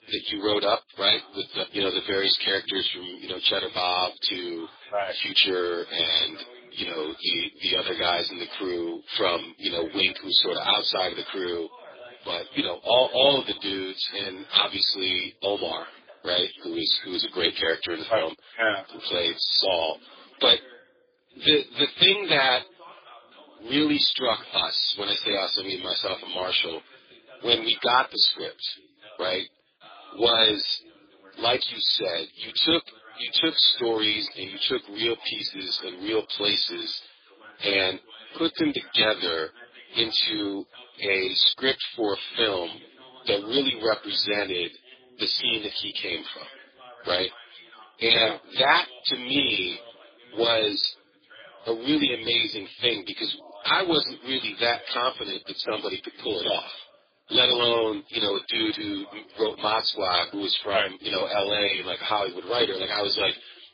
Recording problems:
garbled, watery; badly; nothing above 4.5 kHz
thin; somewhat; fading below 300 Hz
voice in the background; faint; throughout; 25 dB below the speech

